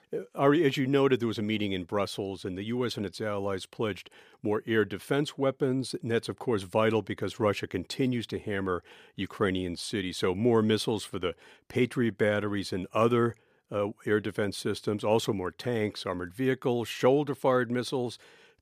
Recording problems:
none

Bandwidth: 15 kHz